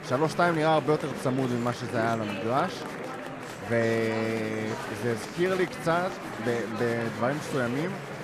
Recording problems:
murmuring crowd; loud; throughout; 7 dB below the speech

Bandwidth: 14.5 kHz